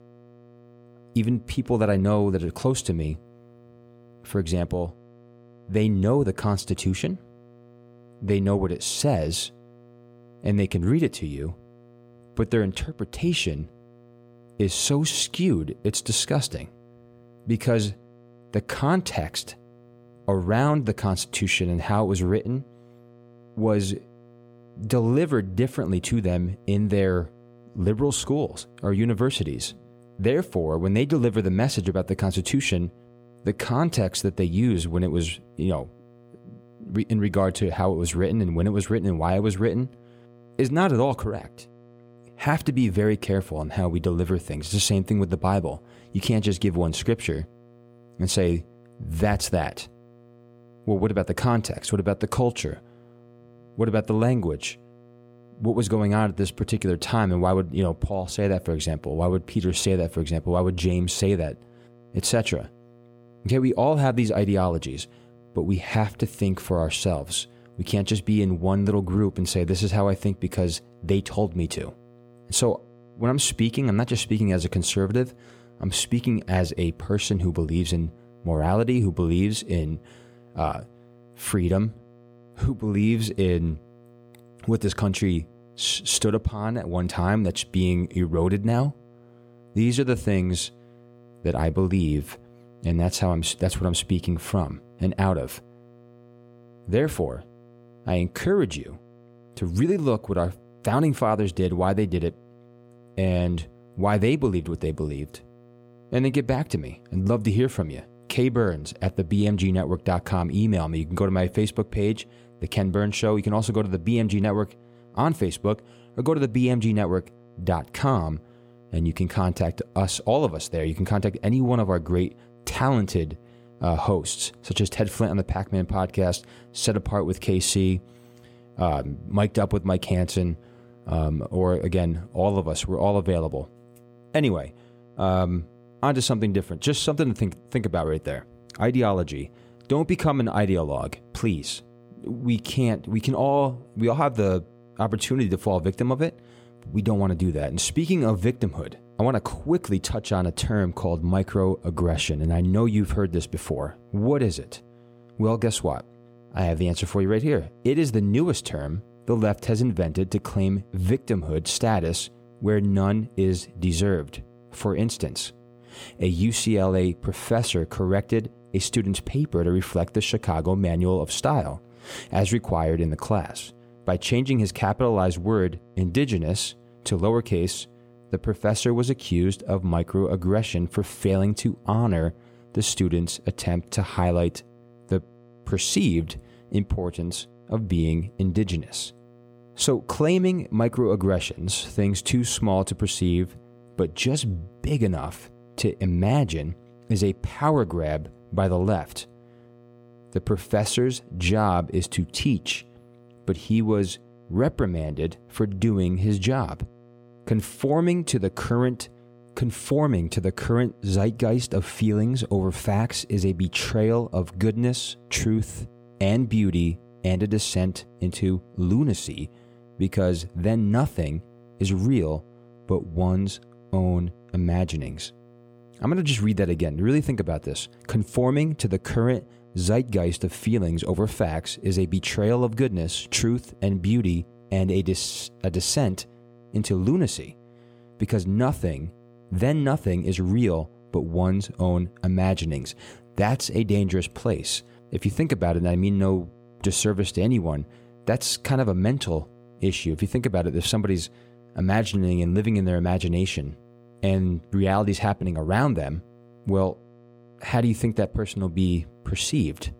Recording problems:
electrical hum; faint; throughout; 60 Hz, 30 dB below the speech

